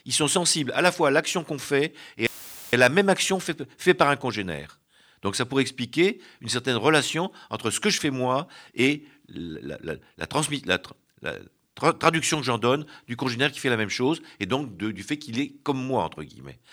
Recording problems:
audio cutting out; filled with static; at 2.5 s

